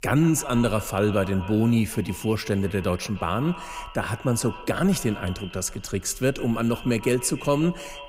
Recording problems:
echo of what is said; noticeable; throughout; 150 ms later, 15 dB below the speech

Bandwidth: 15.5 kHz